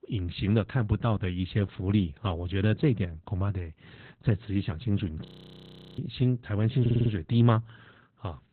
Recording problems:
garbled, watery; badly; nothing above 4 kHz
audio freezing; at 5.5 s for 0.5 s
audio stuttering; at 7 s

